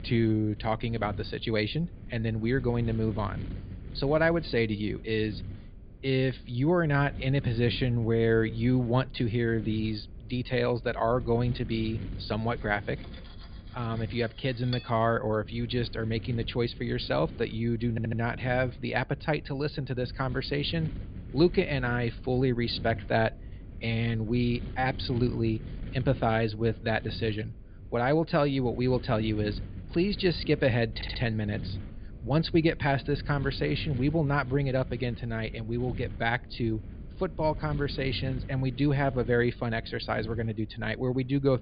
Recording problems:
high frequencies cut off; severe; nothing above 4.5 kHz
wind noise on the microphone; occasional gusts; 20 dB below the speech
clattering dishes; faint; from 13 to 15 s; peak 10 dB below the speech
audio stuttering; at 18 s and at 31 s

